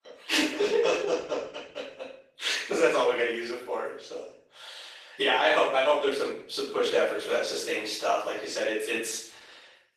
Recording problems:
off-mic speech; far
thin; very; fading below 400 Hz
room echo; noticeable; dies away in 0.6 s
garbled, watery; slightly; nothing above 14 kHz

